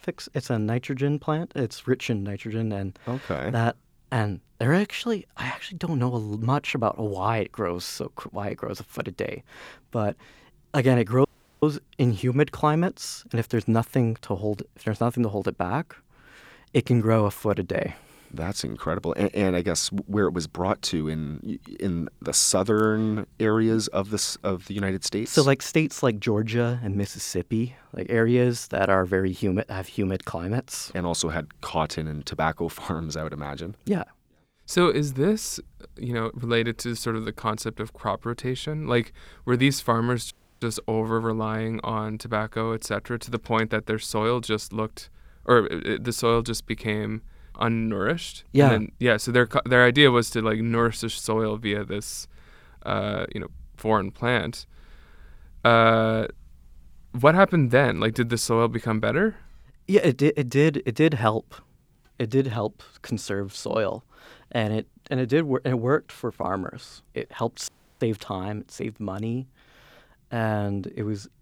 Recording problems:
audio cutting out; at 11 s, at 40 s and at 1:08

